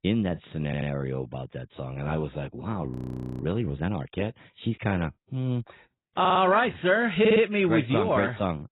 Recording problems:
garbled, watery; badly; nothing above 4 kHz
audio stuttering; at 0.5 s, at 6 s and at 7 s
audio freezing; at 3 s for 0.5 s

